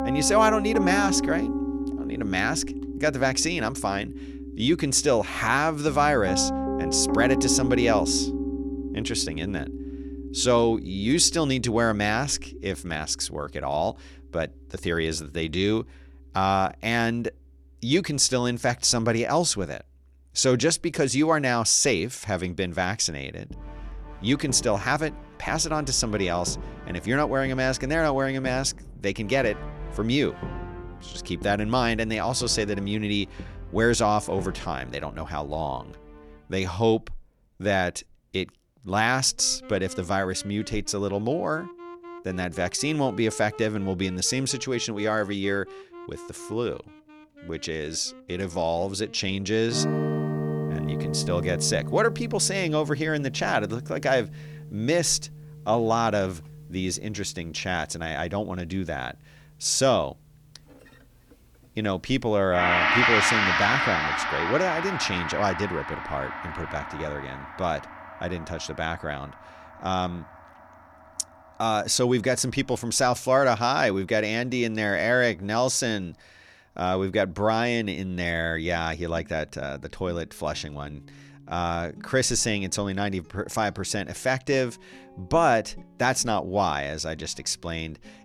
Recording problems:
background music; loud; throughout; 5 dB below the speech

